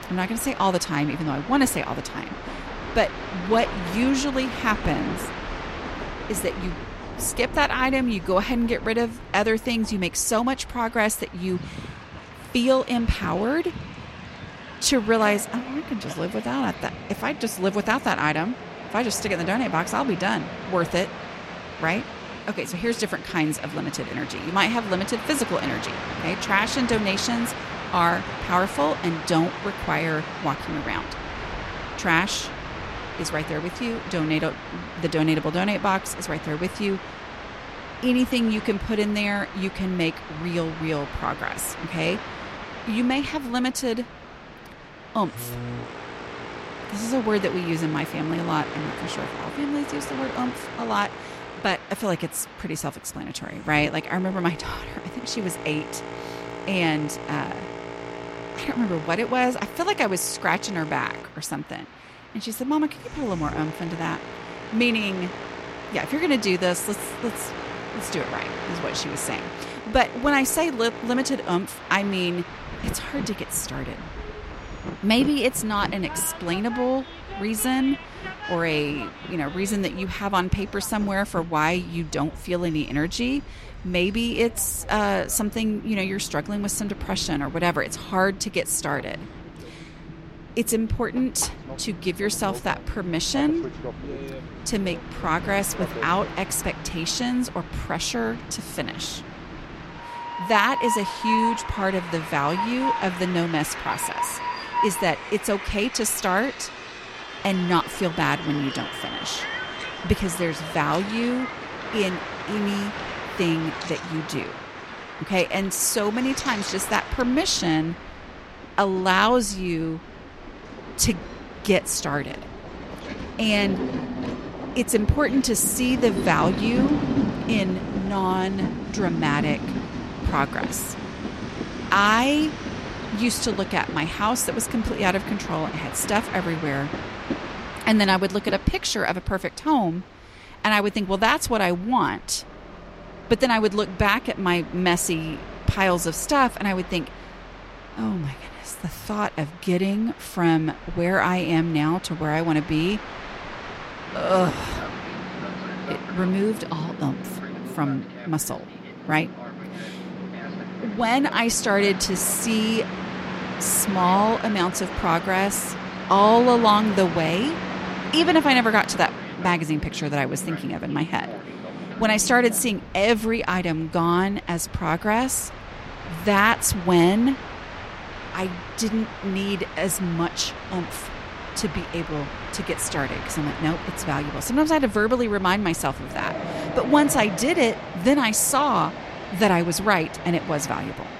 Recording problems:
train or aircraft noise; loud; throughout; 10 dB below the speech

